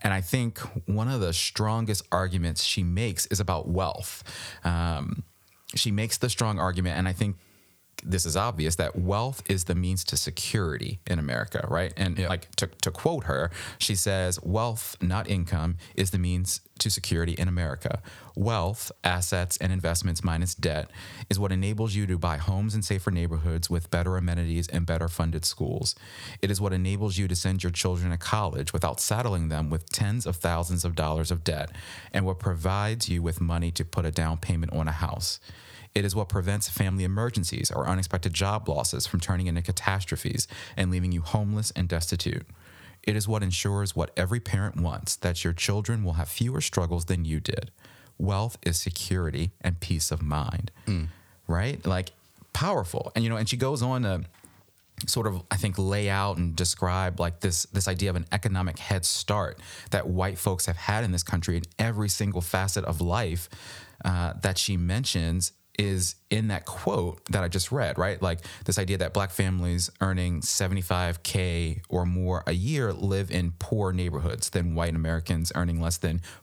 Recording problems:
squashed, flat; somewhat

